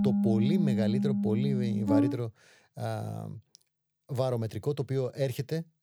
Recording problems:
background music; very loud; until 2 s; 4 dB above the speech

